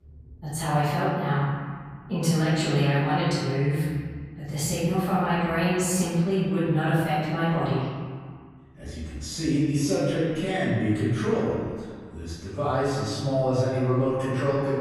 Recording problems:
room echo; strong; dies away in 1.7 s
off-mic speech; far

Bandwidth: 15 kHz